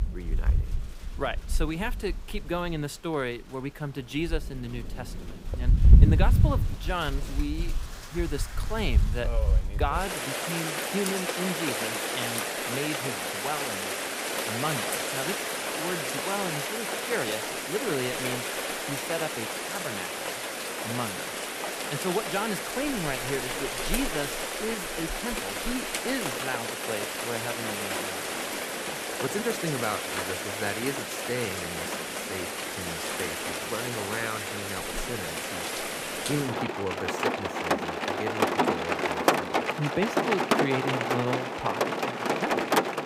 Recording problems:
rain or running water; very loud; throughout; 5 dB above the speech

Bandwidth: 15.5 kHz